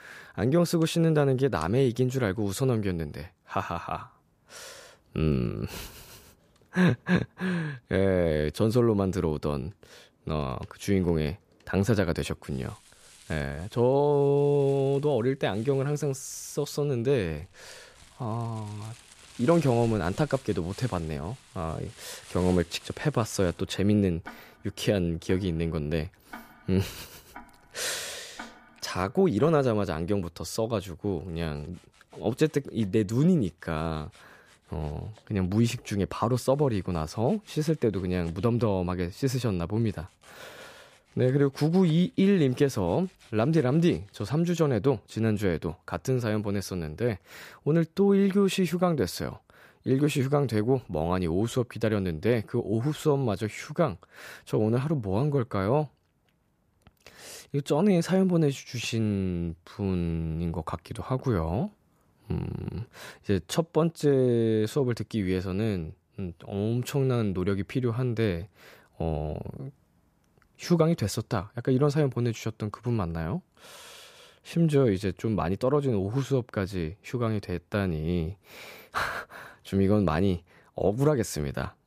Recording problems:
household noises; faint; until 44 s; 25 dB below the speech

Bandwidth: 14.5 kHz